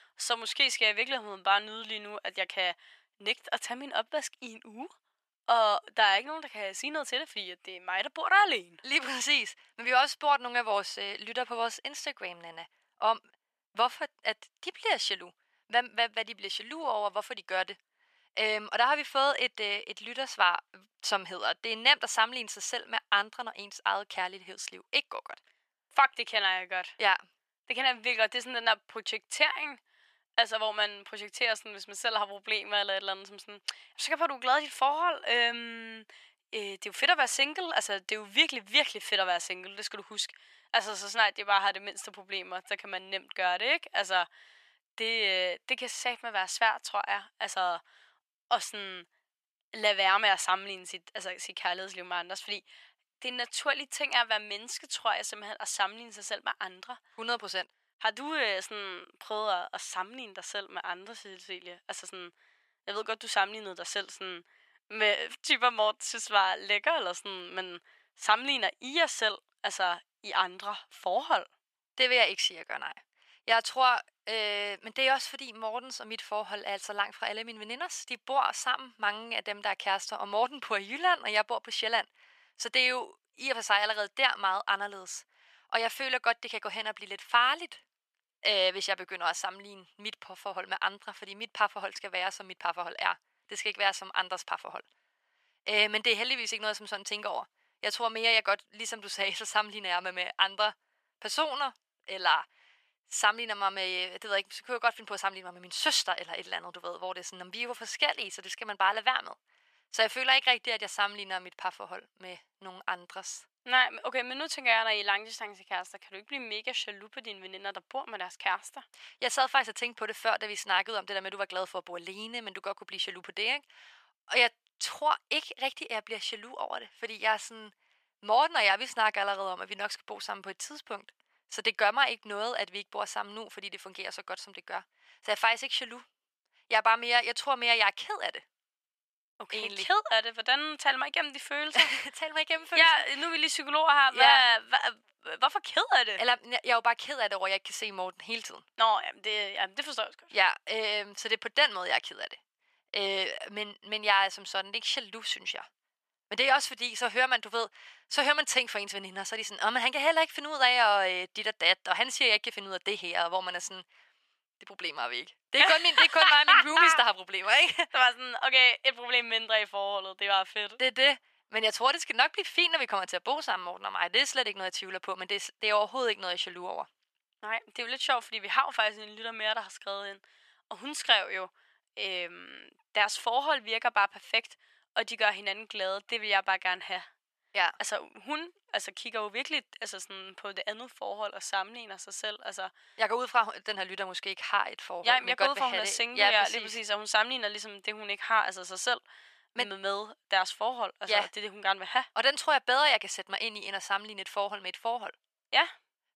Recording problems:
thin; very; fading below 750 Hz

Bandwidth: 14.5 kHz